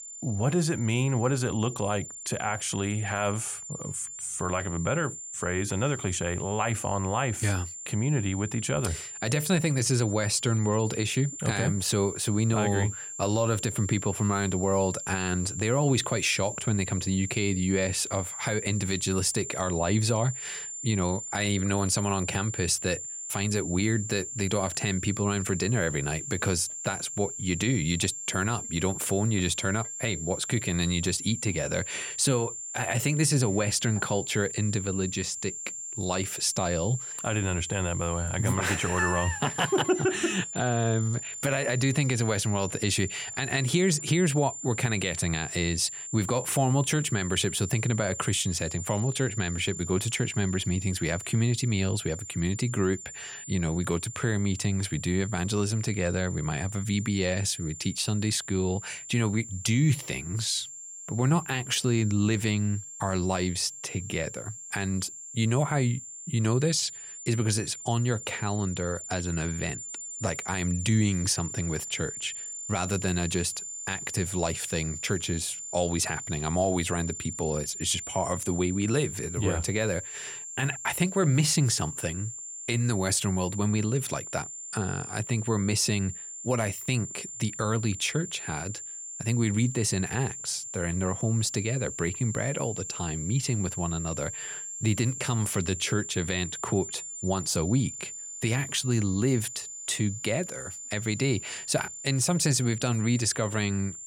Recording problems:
high-pitched whine; loud; throughout; 7.5 kHz, 8 dB below the speech

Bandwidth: 17.5 kHz